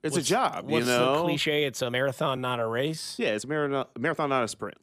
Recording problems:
uneven, jittery; strongly; from 1 to 4.5 s

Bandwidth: 15 kHz